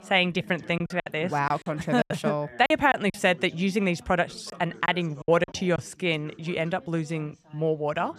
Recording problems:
background chatter; faint; throughout; 3 voices, 20 dB below the speech
choppy; very; from 1 to 3 s and from 4.5 to 6 s; 12% of the speech affected

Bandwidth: 14 kHz